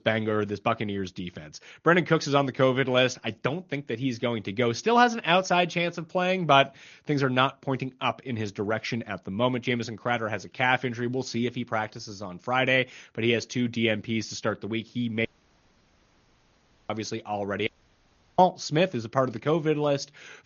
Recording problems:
garbled, watery; slightly; nothing above 6.5 kHz
audio cutting out; at 15 s for 1.5 s and at 18 s for 0.5 s

